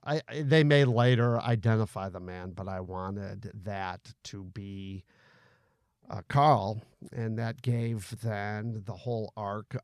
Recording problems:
none

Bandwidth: 14 kHz